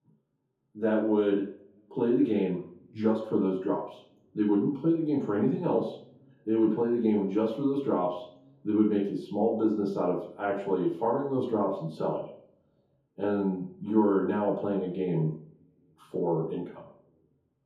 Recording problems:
off-mic speech; far
room echo; noticeable; dies away in 0.6 s

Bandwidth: 14.5 kHz